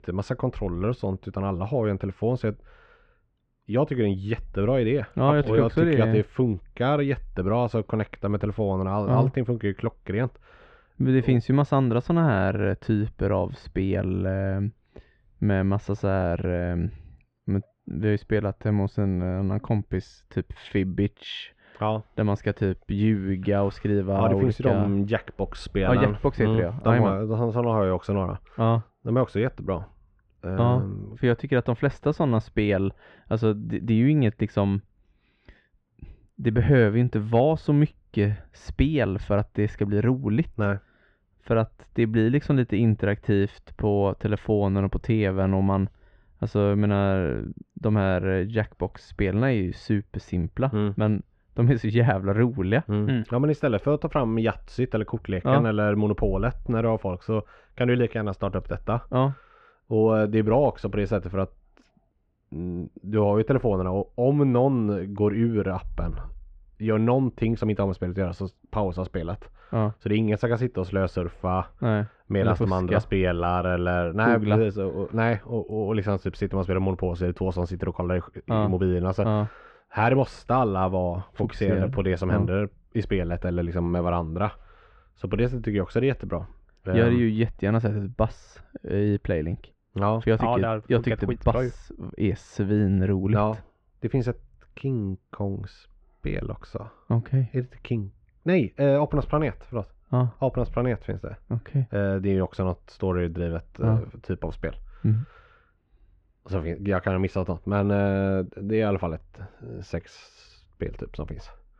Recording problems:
muffled; very; fading above 3 kHz

